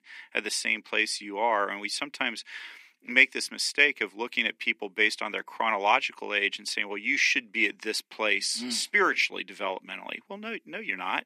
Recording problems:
thin; somewhat; fading below 250 Hz

